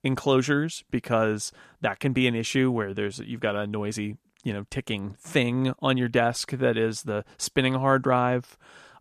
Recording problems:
none

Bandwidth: 14.5 kHz